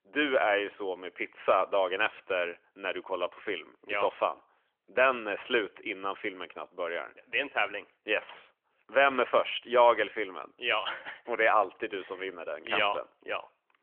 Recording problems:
phone-call audio; nothing above 3 kHz

